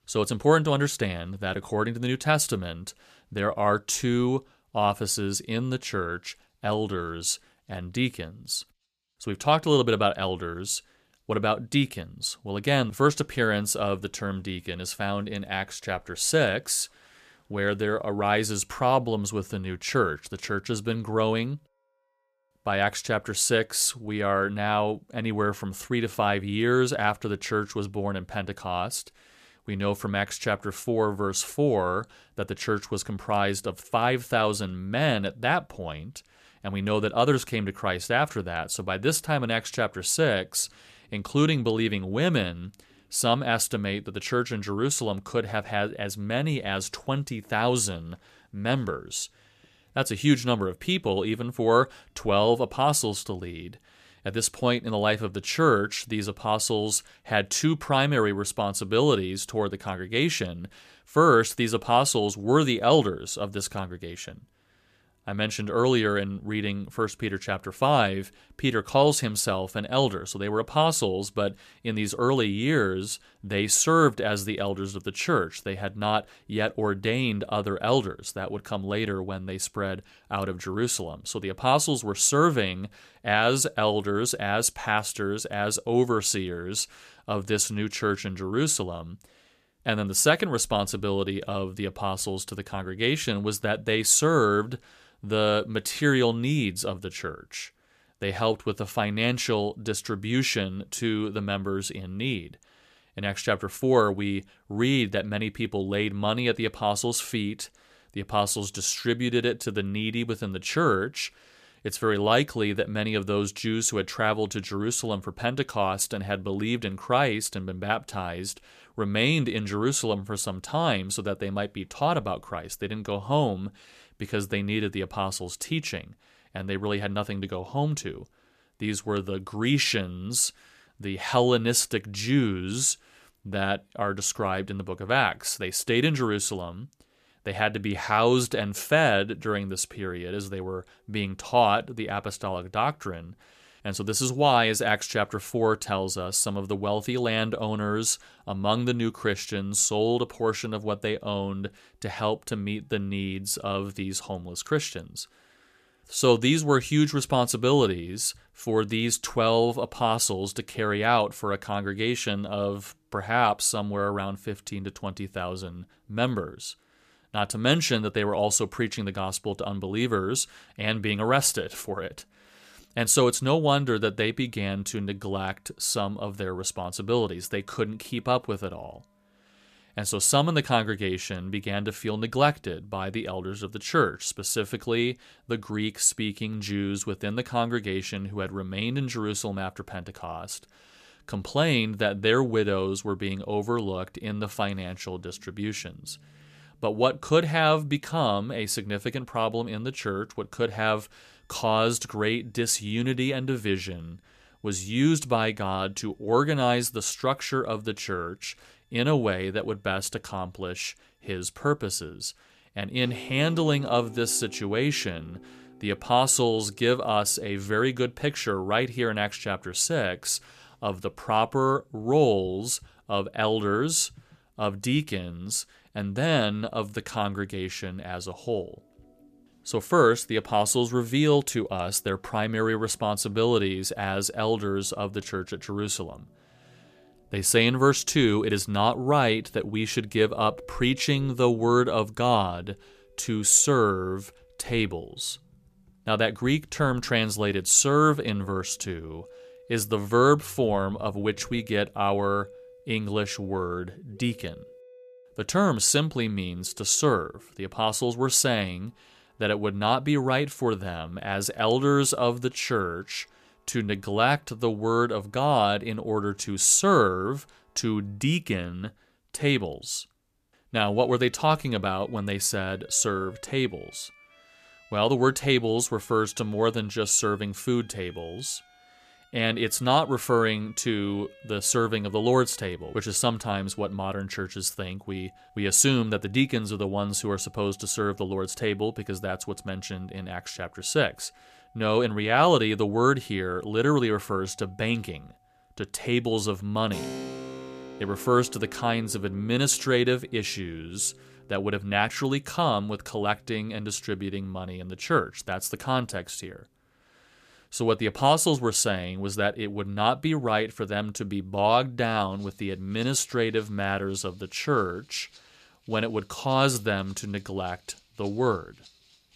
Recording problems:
background music; faint; throughout; 25 dB below the speech

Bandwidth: 14.5 kHz